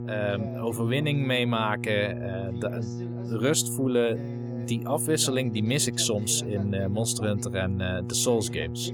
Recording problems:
electrical hum; noticeable; throughout; 60 Hz, 15 dB below the speech
voice in the background; noticeable; throughout; 20 dB below the speech

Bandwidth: 18.5 kHz